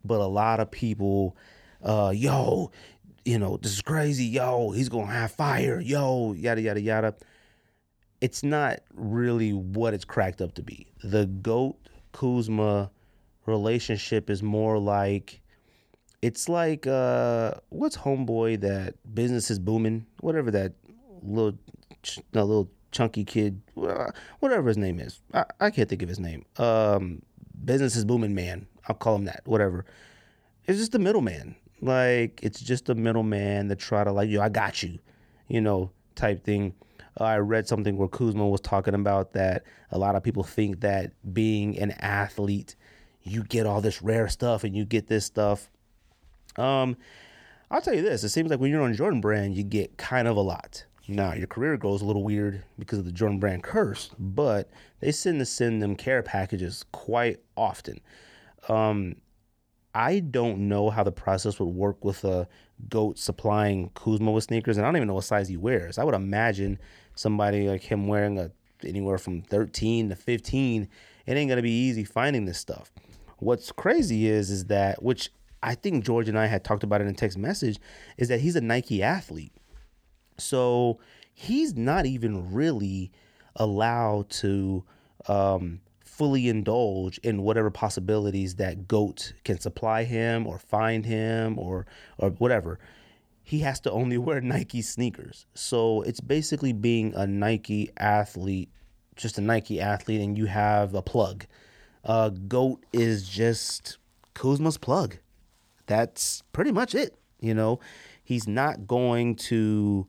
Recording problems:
none

